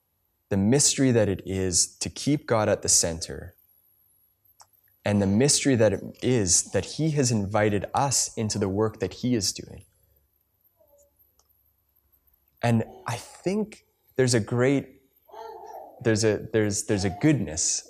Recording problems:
none

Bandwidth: 14.5 kHz